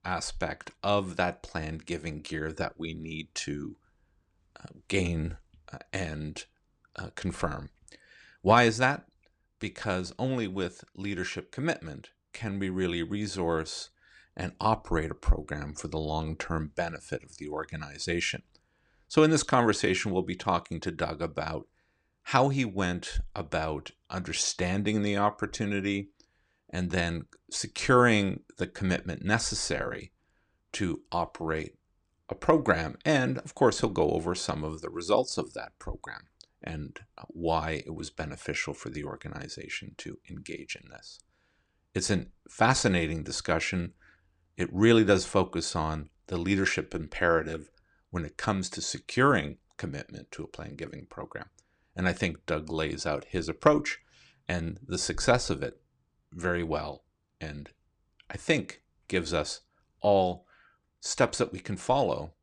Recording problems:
none

